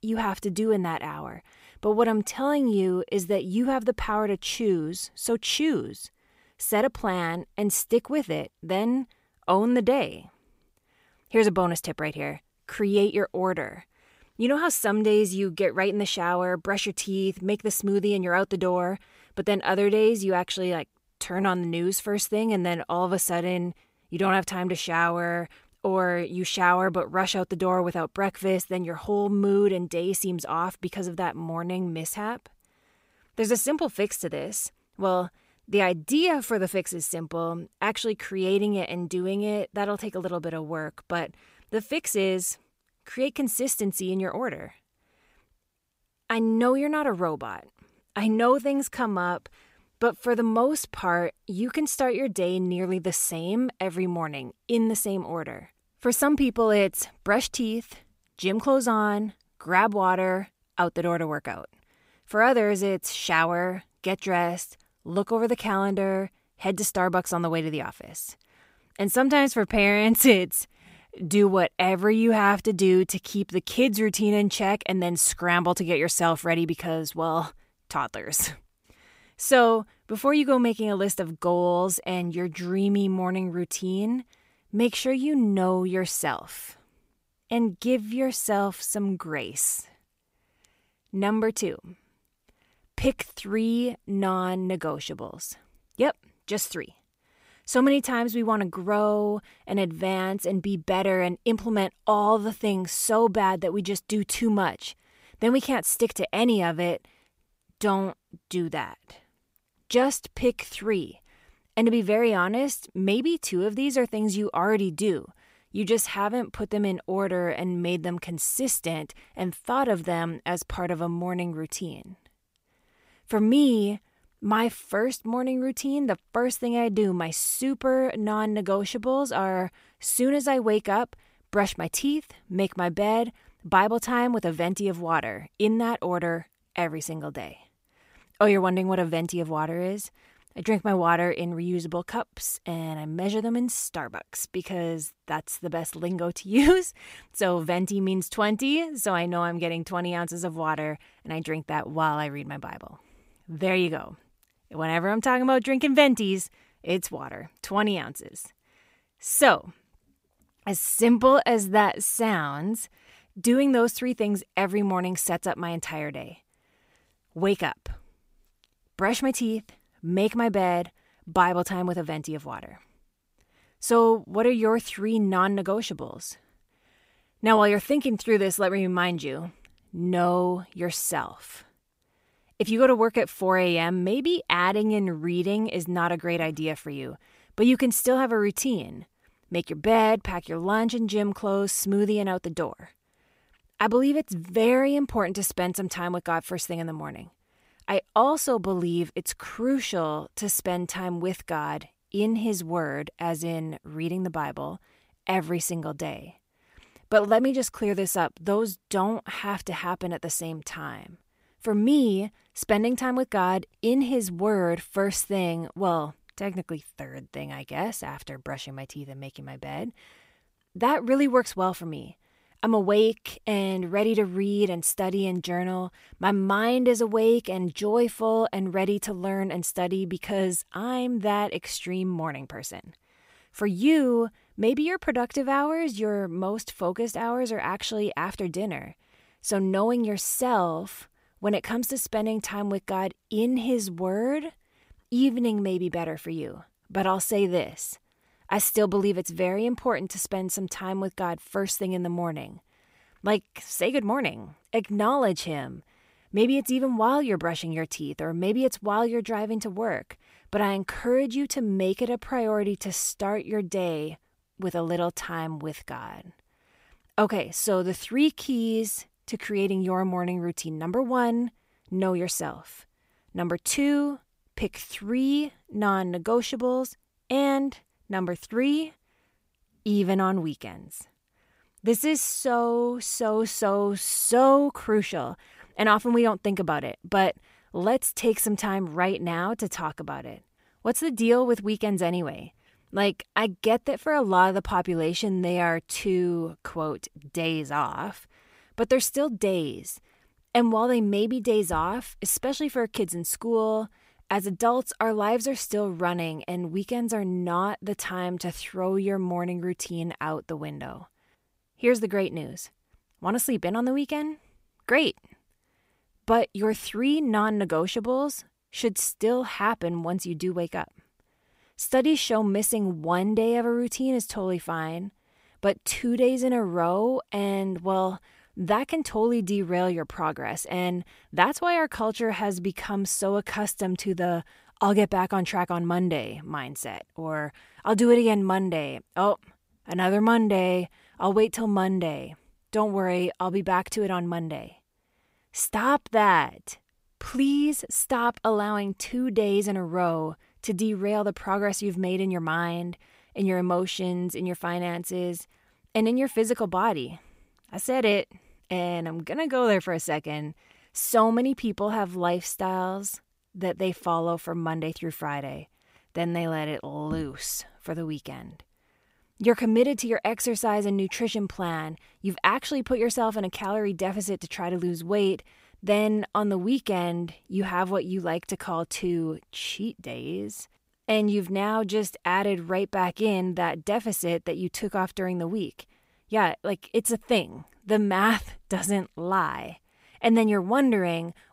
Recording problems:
none

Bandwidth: 15.5 kHz